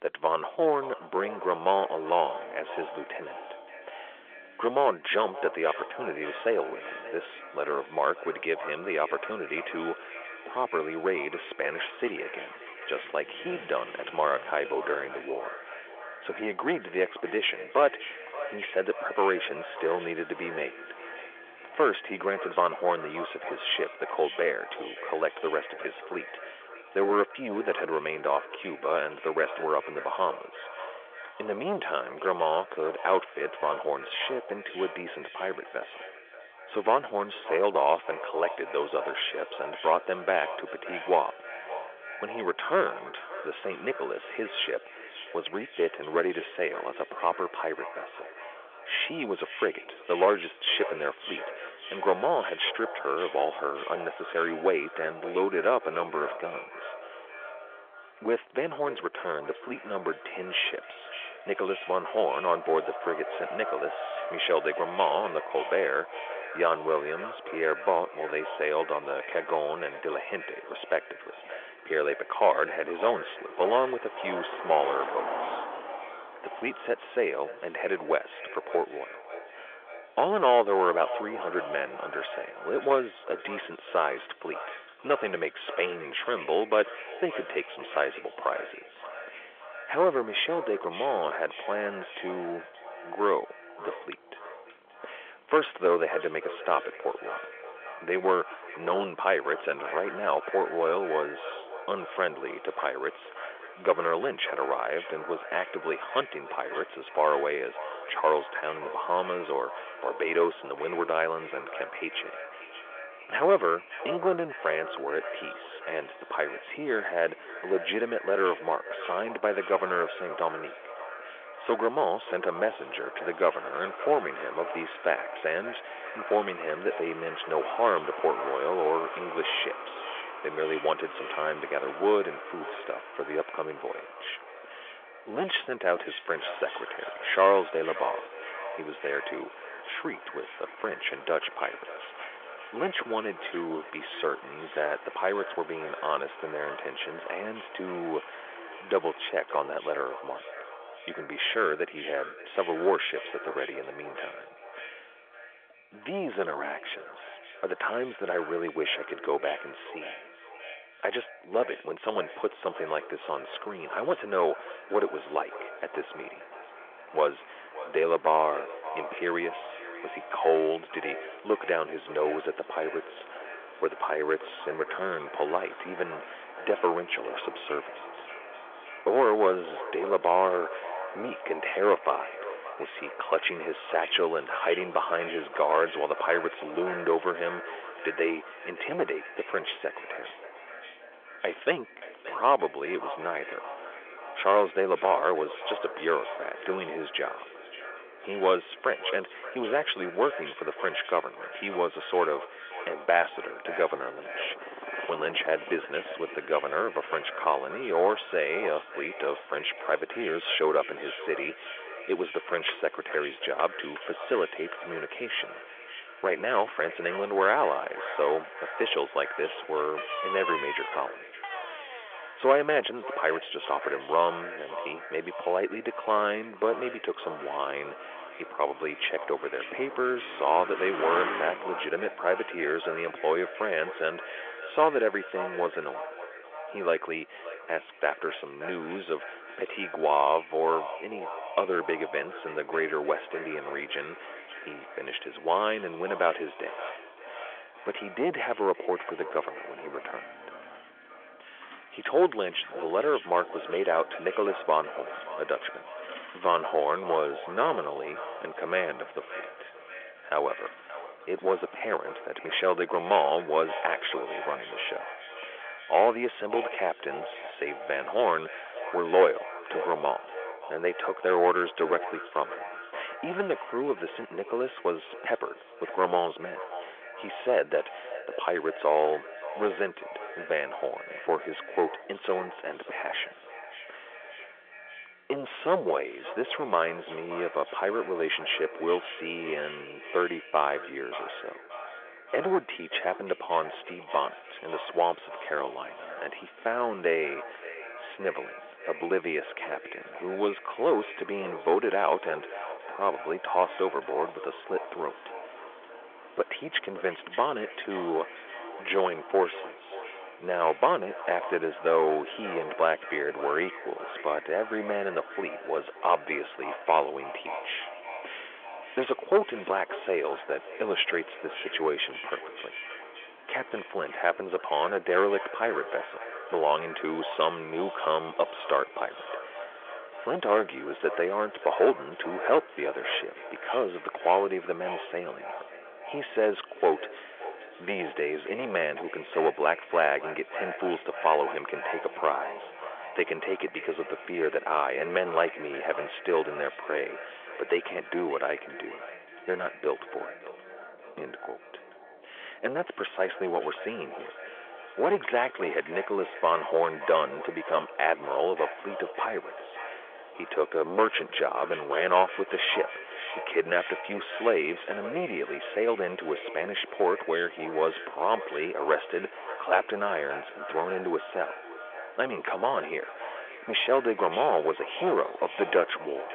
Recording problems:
echo of what is said; strong; throughout; 580 ms later, 10 dB below the speech
phone-call audio; nothing above 3.5 kHz
distortion; slight; 15 dB below the speech
traffic noise; noticeable; throughout; 15 dB below the speech

